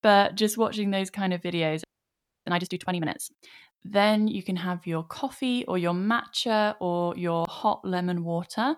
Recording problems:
audio freezing; at 2 s for 0.5 s

